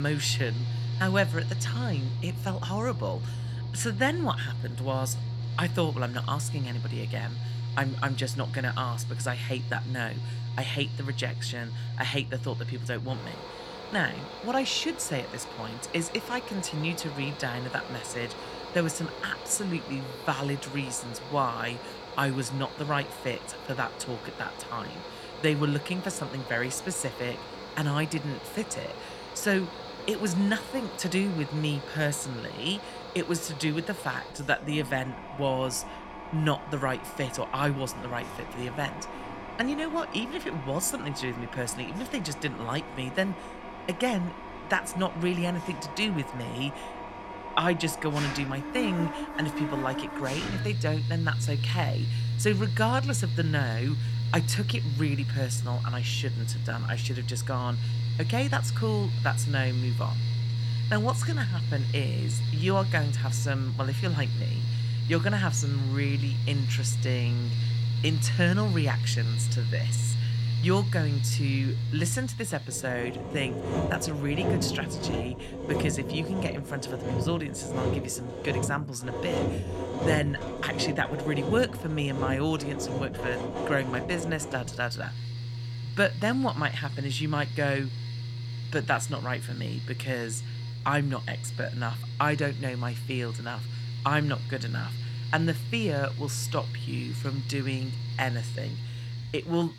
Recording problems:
machinery noise; loud; throughout; 2 dB below the speech
abrupt cut into speech; at the start

